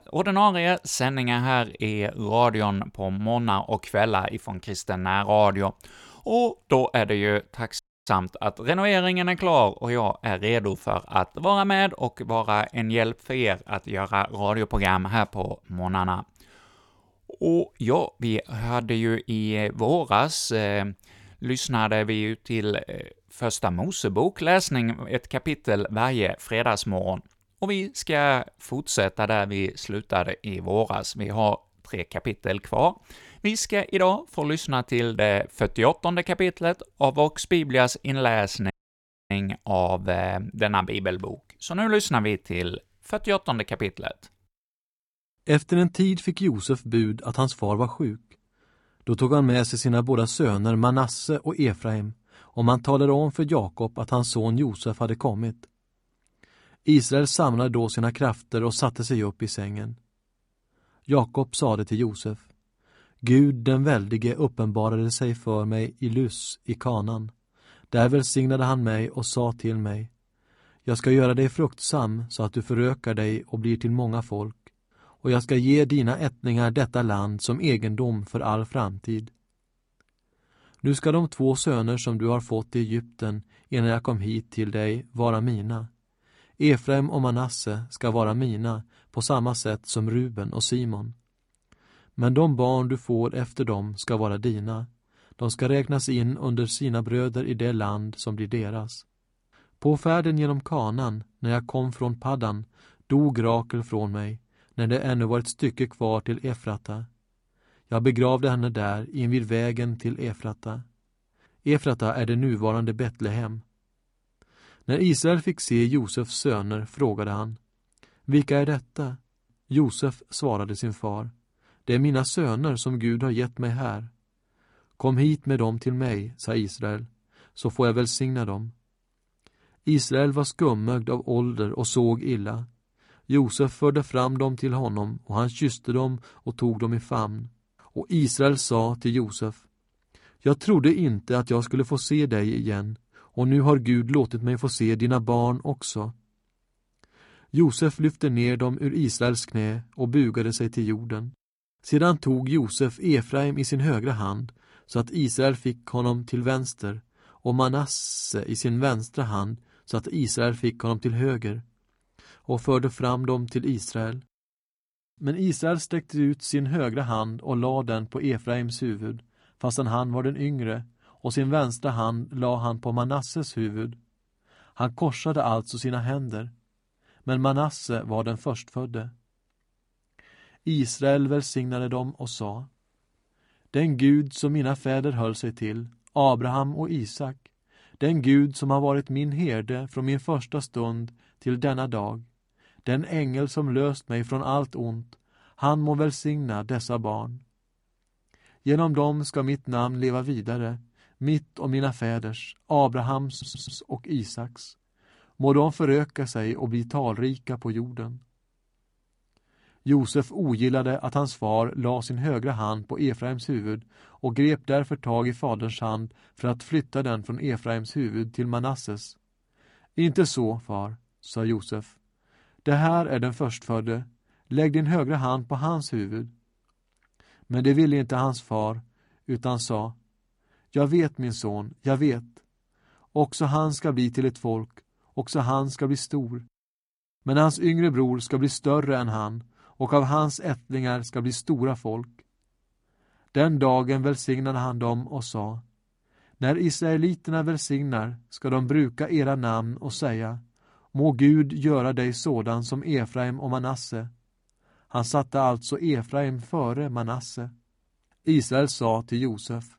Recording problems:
audio cutting out; at 8 s and at 39 s for 0.5 s
audio stuttering; at 2:38 and at 3:23

